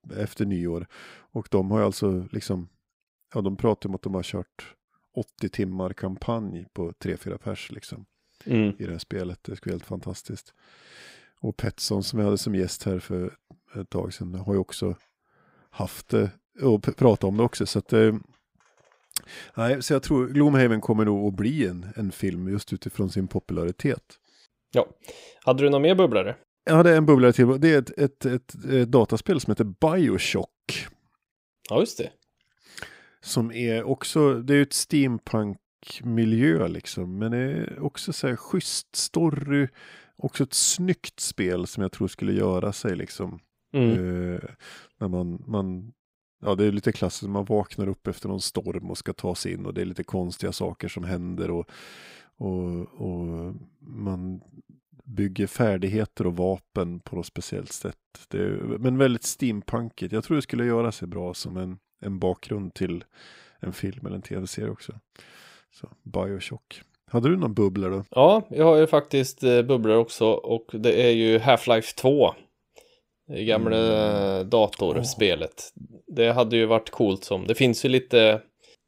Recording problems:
none

